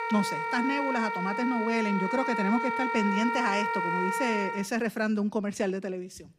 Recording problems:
background music; loud; throughout; 1 dB below the speech

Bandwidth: 15.5 kHz